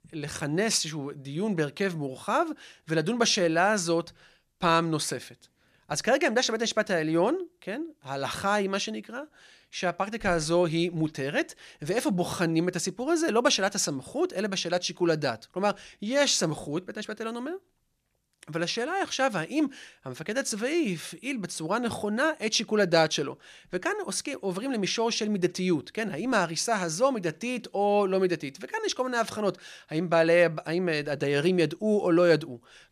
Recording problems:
none

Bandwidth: 14.5 kHz